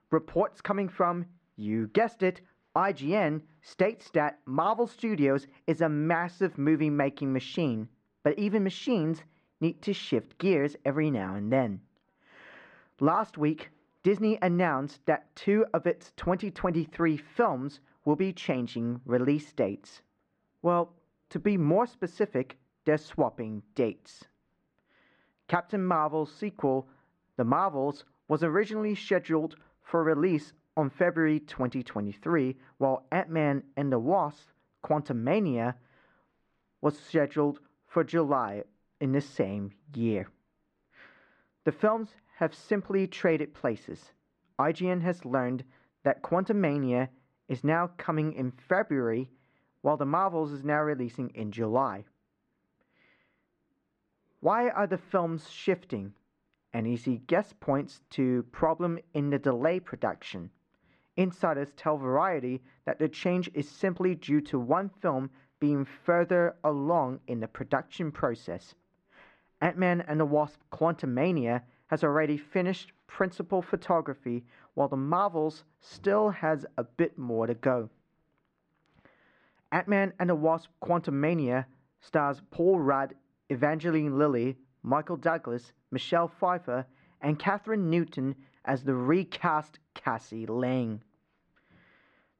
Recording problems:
muffled; very; fading above 1.5 kHz

